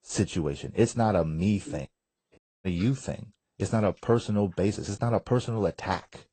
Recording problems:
garbled, watery; slightly; nothing above 8.5 kHz
audio cutting out; at 2.5 s

